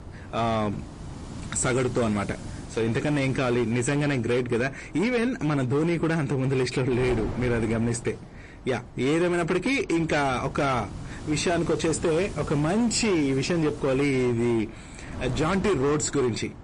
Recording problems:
distortion; slight; 14% of the sound clipped
garbled, watery; slightly; nothing above 8.5 kHz
wind noise on the microphone; occasional gusts; 15 dB below the speech

